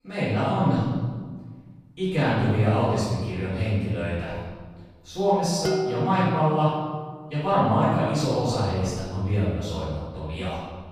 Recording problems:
room echo; strong; dies away in 1.5 s
off-mic speech; far
clattering dishes; noticeable; at 5.5 s; peak 2 dB below the speech

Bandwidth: 15 kHz